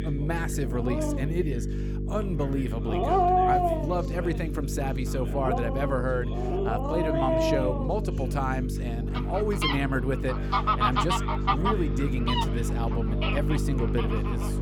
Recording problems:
animal sounds; very loud; throughout; 3 dB above the speech
electrical hum; loud; throughout; 50 Hz, 7 dB below the speech
voice in the background; noticeable; throughout; 15 dB below the speech

